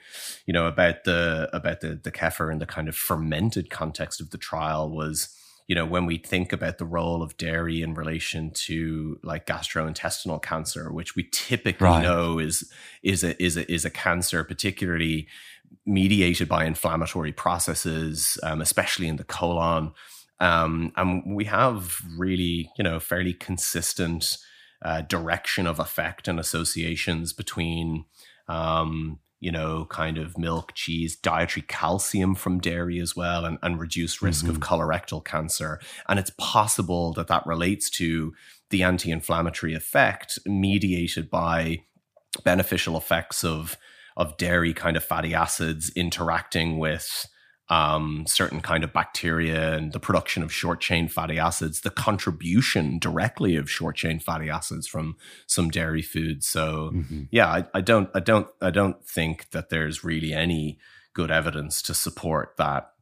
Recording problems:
none

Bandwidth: 15 kHz